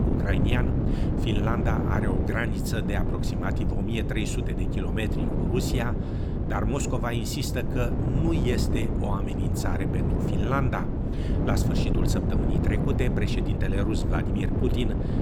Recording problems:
wind noise on the microphone; heavy; 2 dB below the speech

